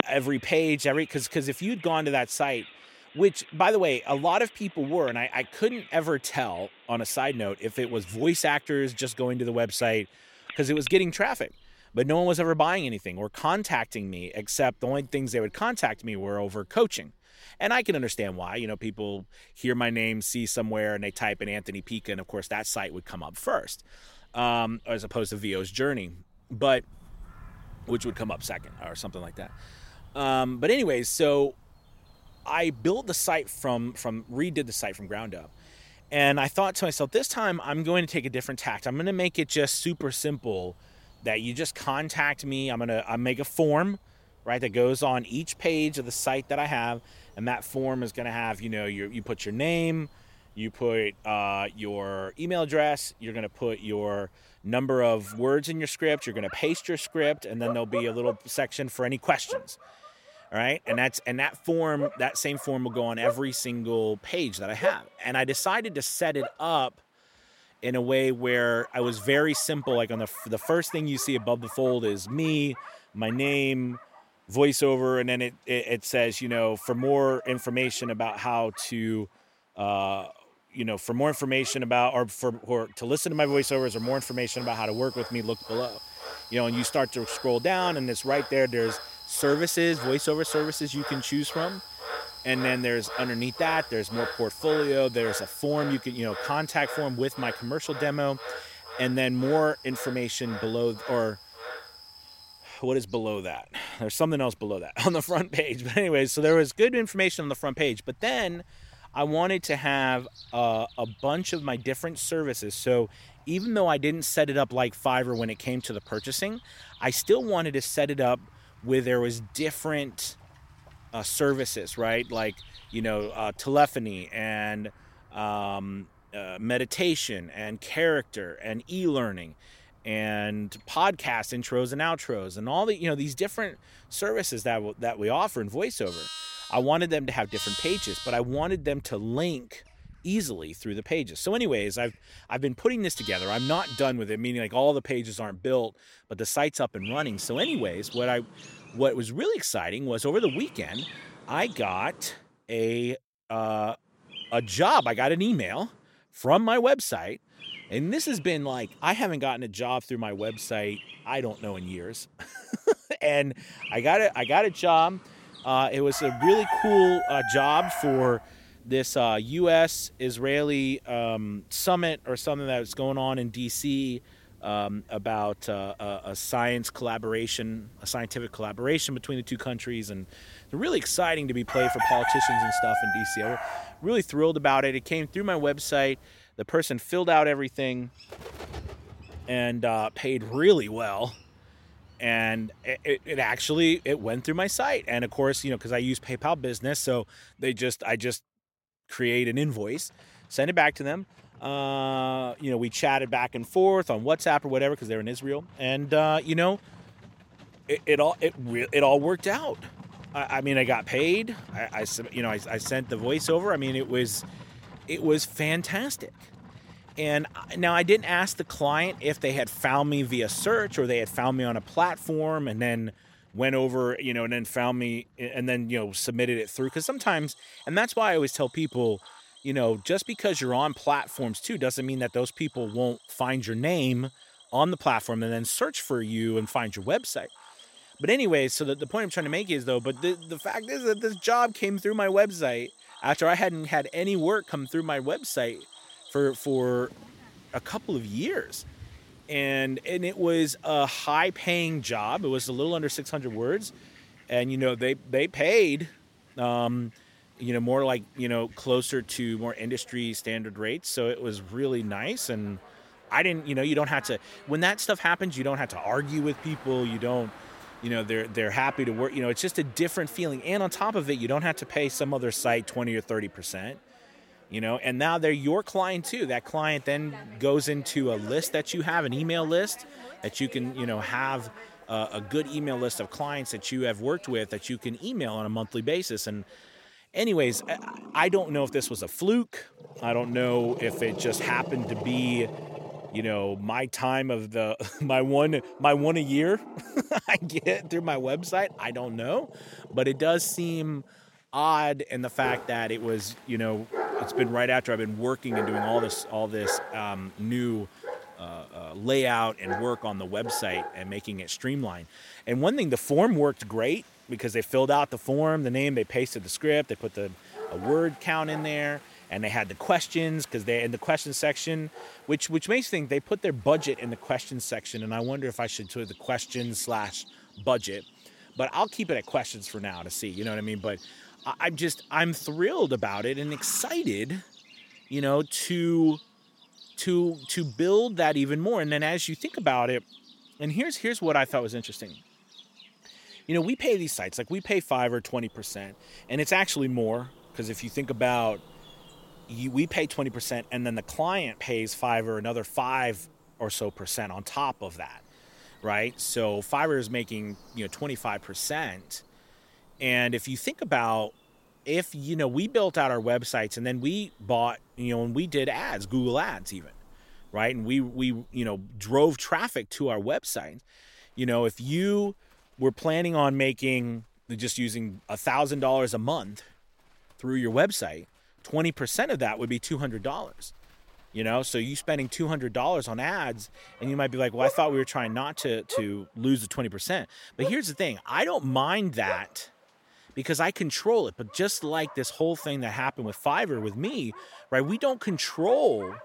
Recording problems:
animal sounds; noticeable; throughout; 10 dB below the speech

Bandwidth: 16.5 kHz